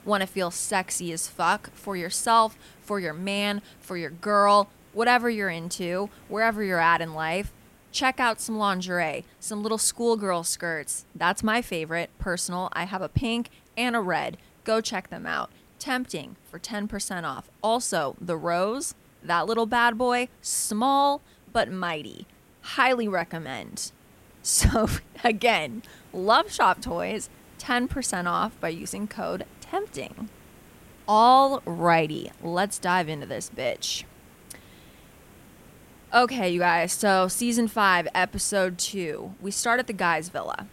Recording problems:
hiss; faint; throughout; 30 dB below the speech

